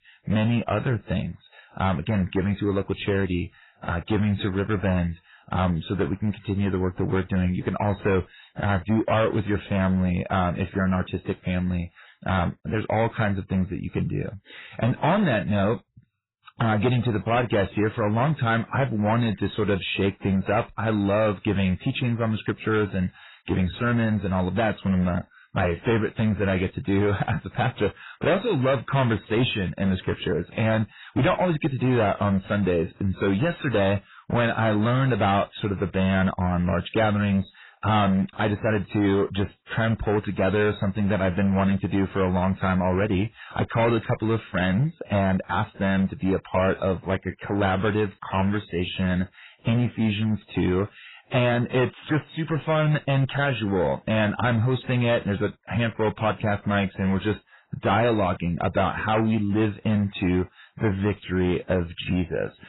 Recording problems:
garbled, watery; badly; nothing above 4 kHz
distortion; slight; 10% of the sound clipped

